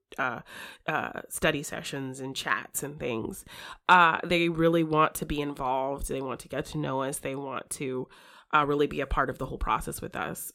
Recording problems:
none

